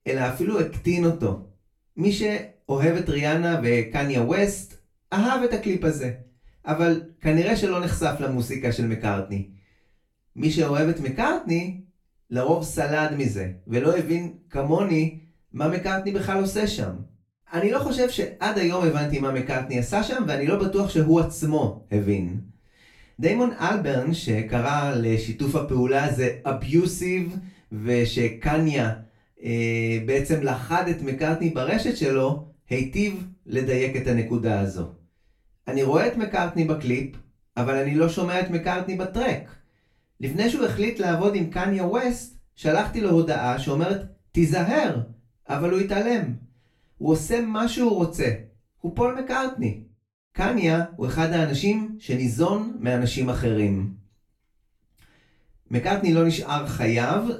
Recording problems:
off-mic speech; far
room echo; slight; dies away in 0.3 s

